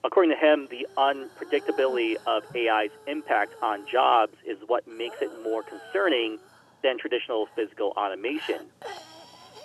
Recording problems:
phone-call audio; nothing above 3 kHz
hiss; noticeable; throughout; 20 dB below the speech

